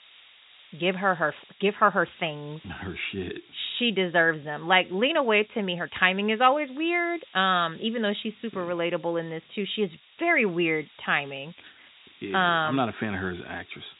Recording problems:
high frequencies cut off; severe; nothing above 4 kHz
hiss; faint; throughout; 25 dB below the speech

